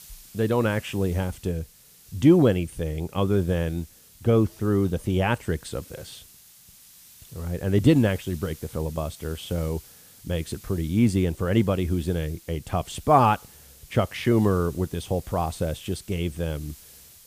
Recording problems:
hiss; faint; throughout; 20 dB below the speech

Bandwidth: 15 kHz